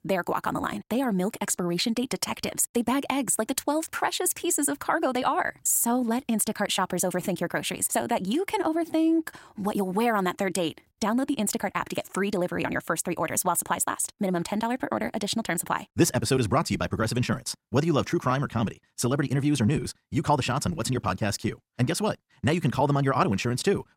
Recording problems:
wrong speed, natural pitch; too fast; 1.5 times normal speed

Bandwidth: 16 kHz